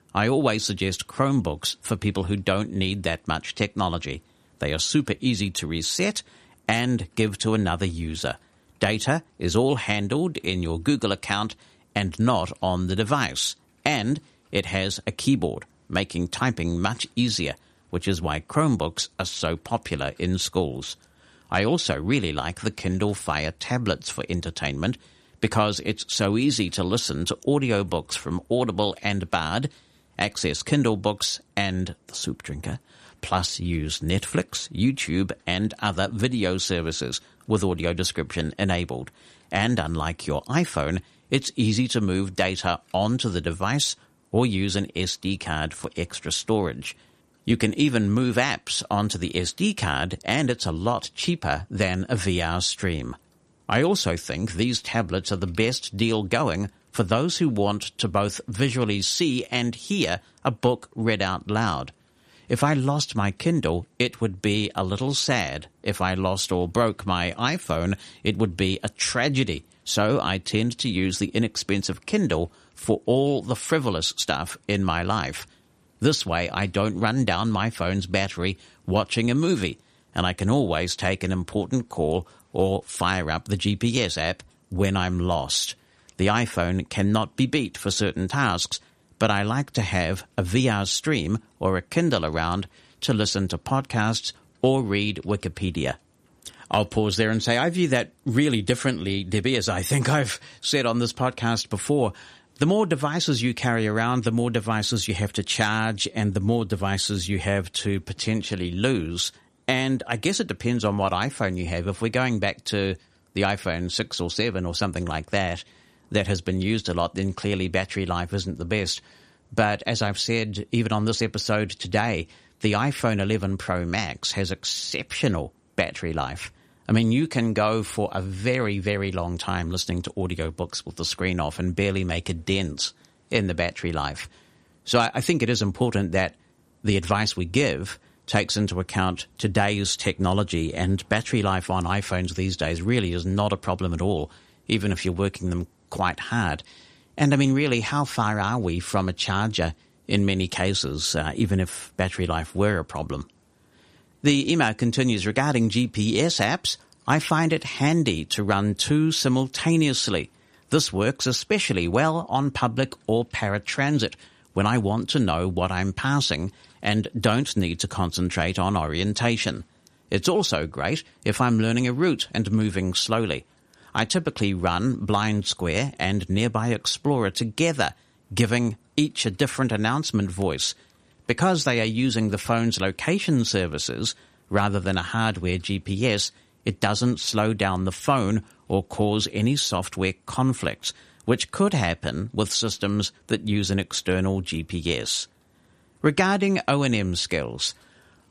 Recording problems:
none

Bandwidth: 14 kHz